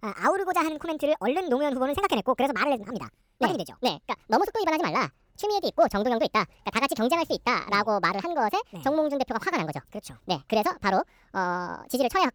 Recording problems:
wrong speed and pitch; too fast and too high; 1.7 times normal speed

